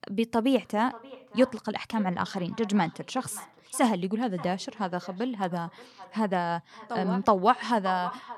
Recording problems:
echo of what is said; noticeable; throughout; 580 ms later, 20 dB below the speech

